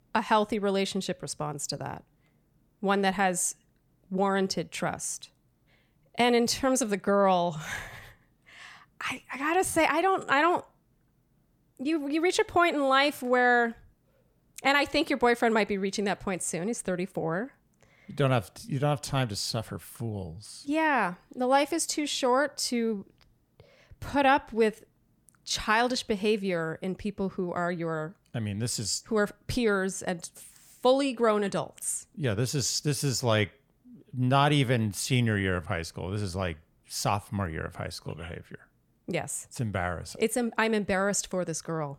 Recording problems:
none

